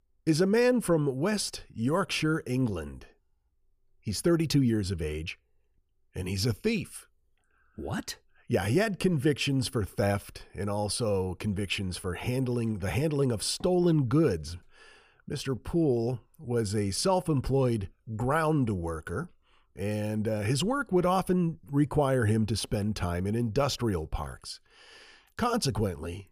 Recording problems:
none

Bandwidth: 15 kHz